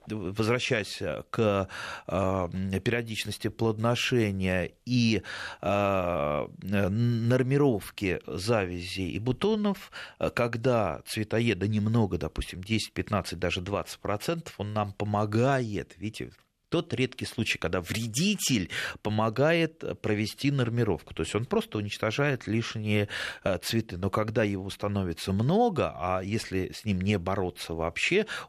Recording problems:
none

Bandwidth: 14 kHz